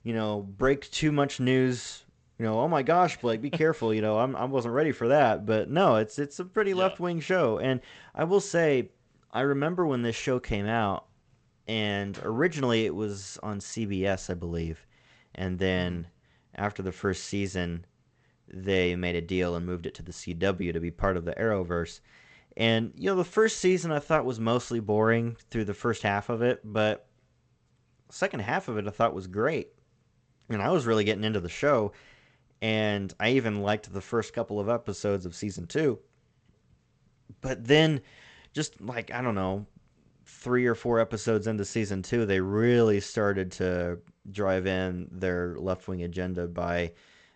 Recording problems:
garbled, watery; slightly; nothing above 8 kHz

